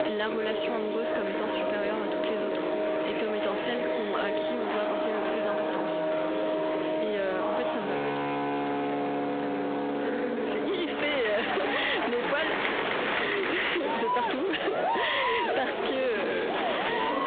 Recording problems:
phone-call audio; poor line; nothing above 3.5 kHz
distortion; slight; 10 dB below the speech
squashed, flat; somewhat
background music; loud; throughout; as loud as the speech
murmuring crowd; loud; throughout; as loud as the speech

